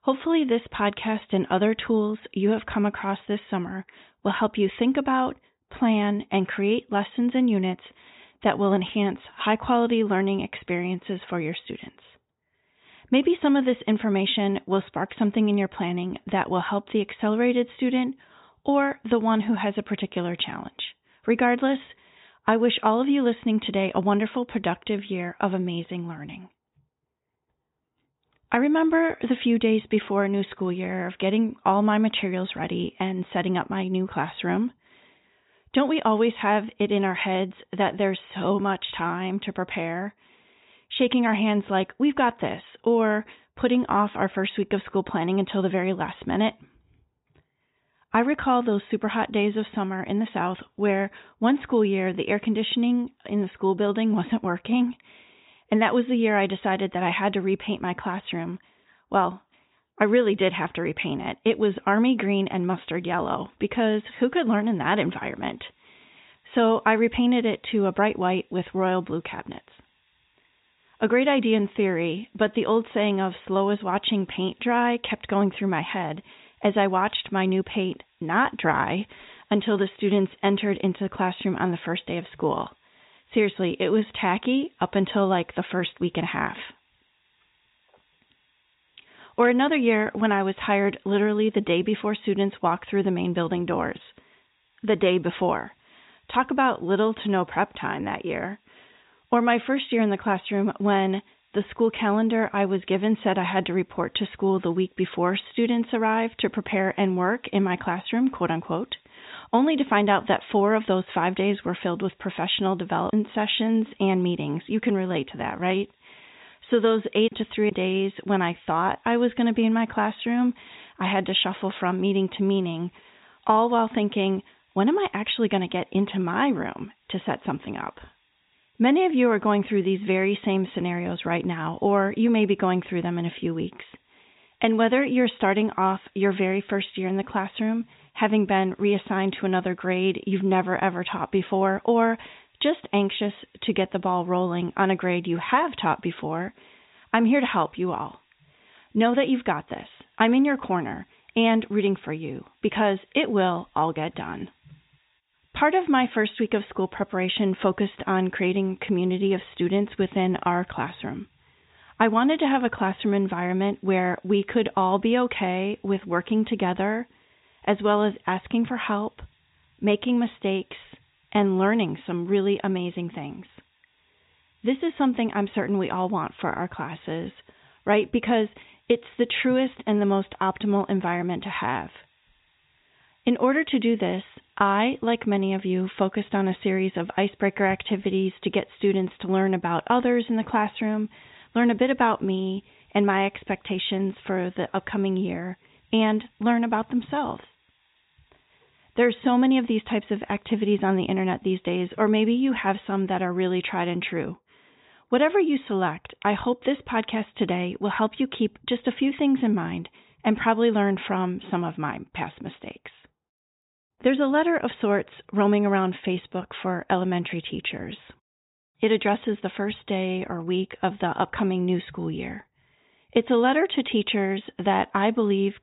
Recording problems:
high frequencies cut off; severe; nothing above 4 kHz
hiss; very faint; from 1:03 to 3:22; 40 dB below the speech

